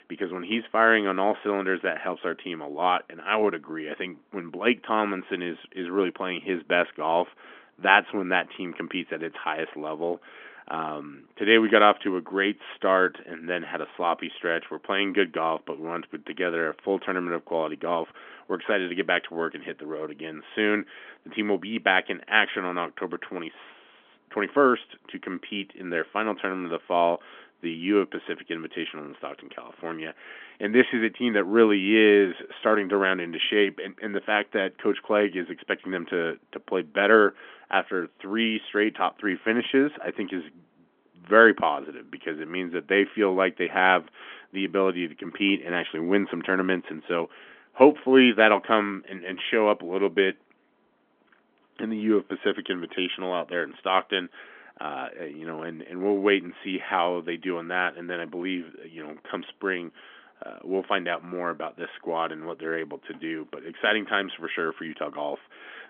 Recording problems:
phone-call audio; nothing above 3.5 kHz

